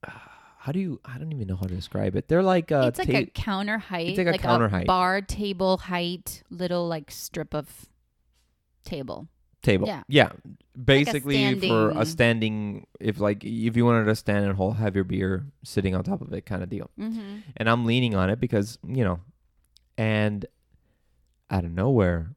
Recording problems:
none

